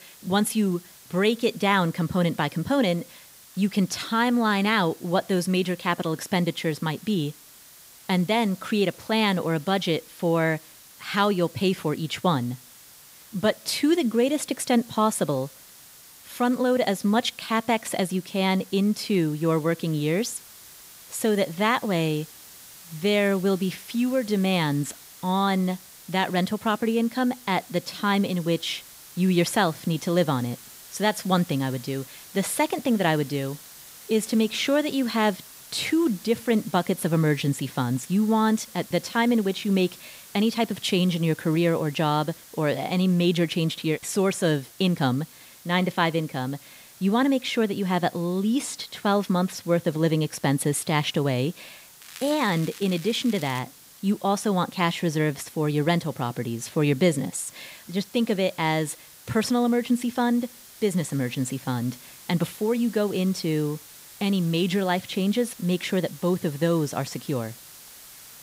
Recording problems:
hiss; noticeable; throughout; 20 dB below the speech
crackling; noticeable; from 52 to 54 s; 15 dB below the speech

